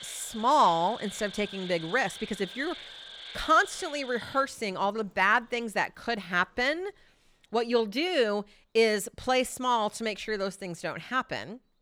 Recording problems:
animal sounds; noticeable; throughout; 15 dB below the speech

